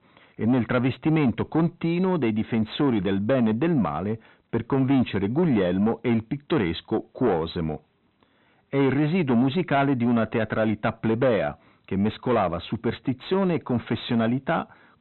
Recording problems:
high frequencies cut off; severe; nothing above 4 kHz
distortion; slight; 10 dB below the speech

